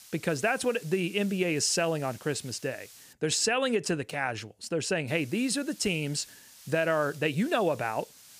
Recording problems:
hiss; faint; until 3 s and from 5 s on; 20 dB below the speech

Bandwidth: 15 kHz